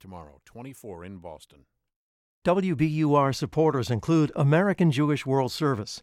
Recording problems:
none

